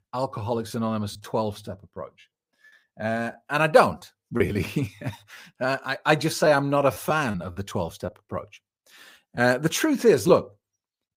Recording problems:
choppy; very; 5% of the speech affected

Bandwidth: 15.5 kHz